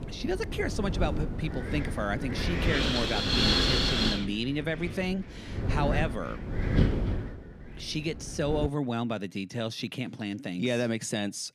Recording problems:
wind noise on the microphone; heavy; until 8.5 s; 3 dB above the speech

